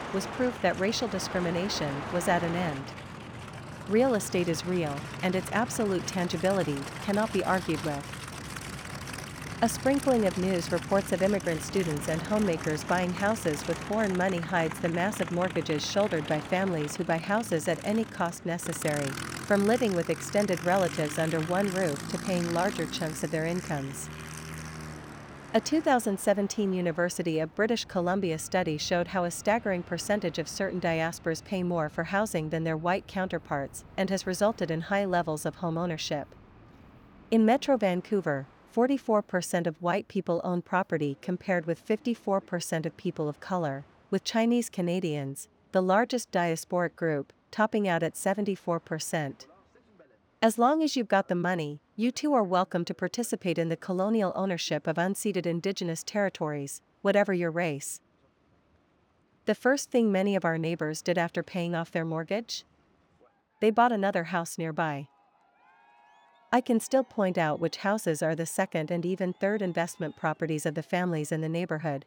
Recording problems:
train or aircraft noise; noticeable; throughout; 10 dB below the speech

